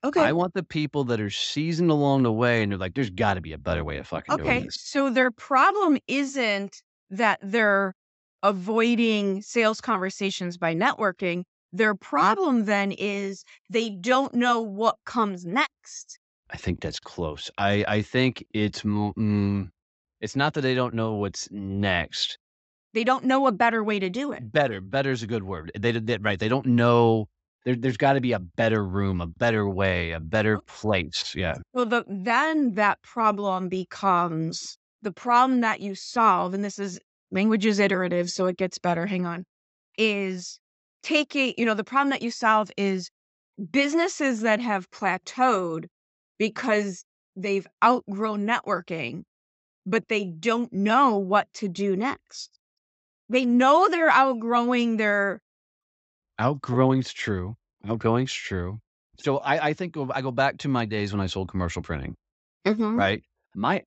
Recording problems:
high frequencies cut off; noticeable; nothing above 8 kHz

